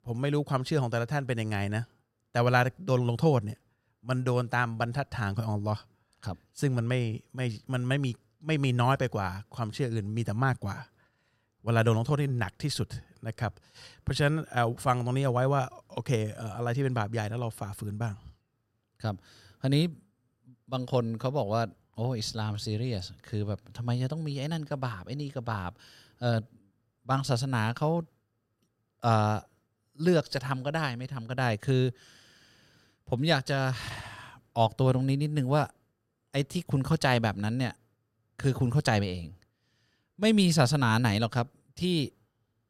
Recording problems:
uneven, jittery; slightly; from 3 to 41 s

